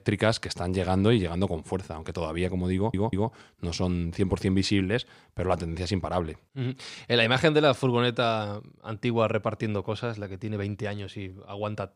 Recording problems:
audio stuttering; at 3 s

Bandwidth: 15 kHz